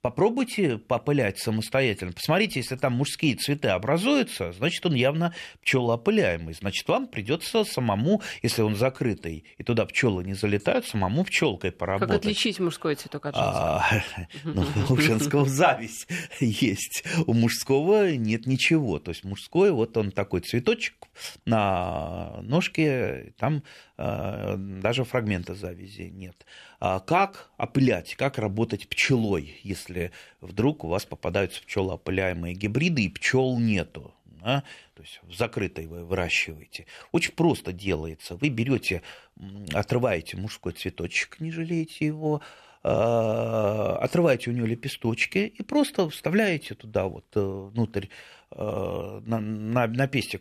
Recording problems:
none

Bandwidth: 14 kHz